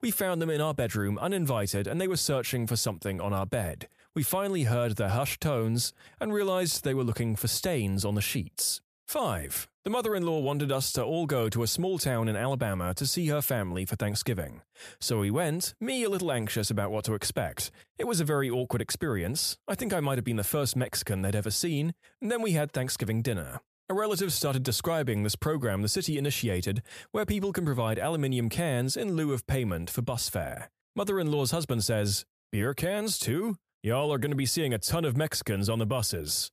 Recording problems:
none

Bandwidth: 14.5 kHz